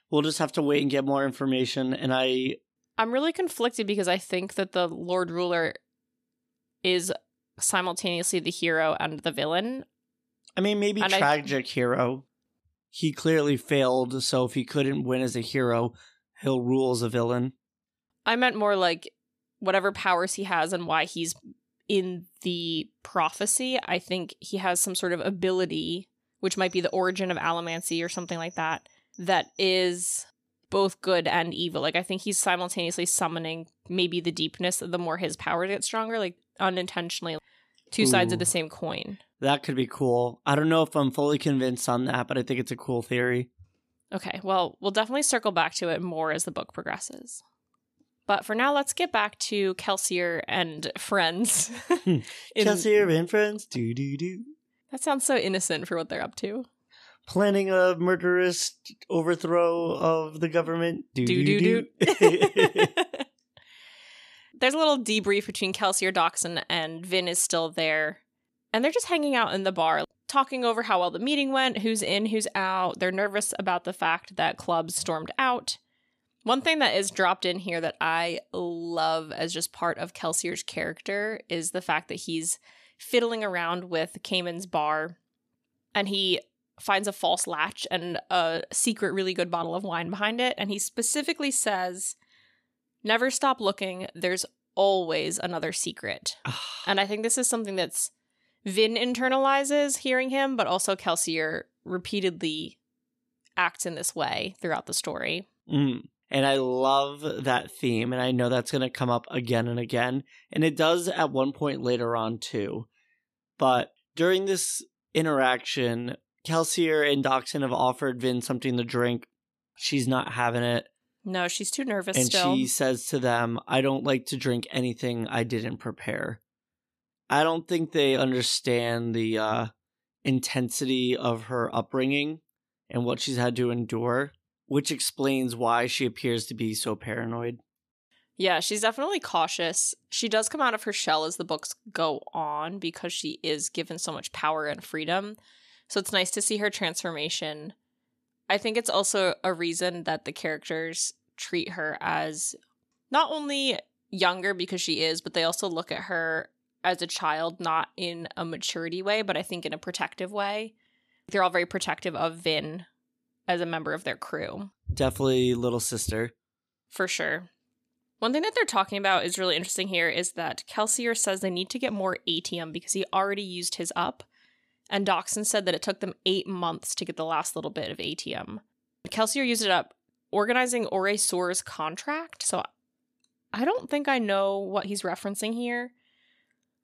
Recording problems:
none

